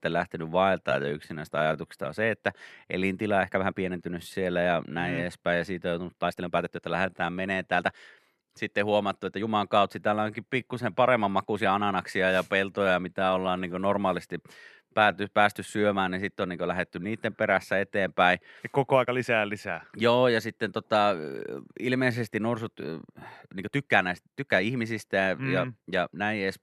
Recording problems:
uneven, jittery; strongly; from 1 to 25 s

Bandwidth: 13.5 kHz